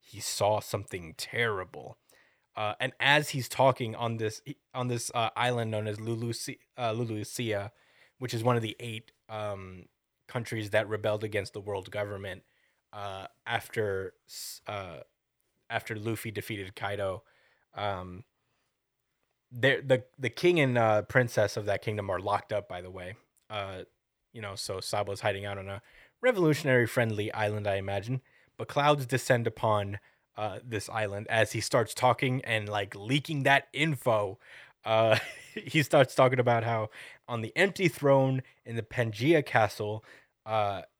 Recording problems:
none

